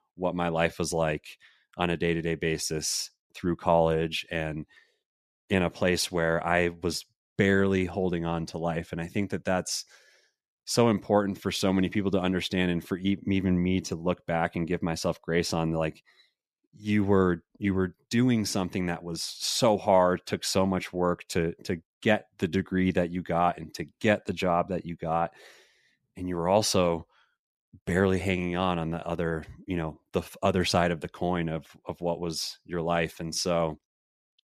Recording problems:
none

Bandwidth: 14.5 kHz